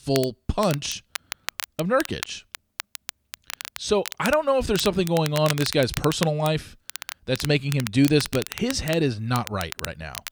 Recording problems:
crackle, like an old record; noticeable; 10 dB below the speech

